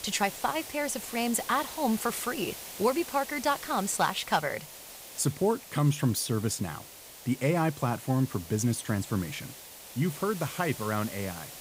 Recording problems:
hiss; noticeable; throughout; 10 dB below the speech

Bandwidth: 15.5 kHz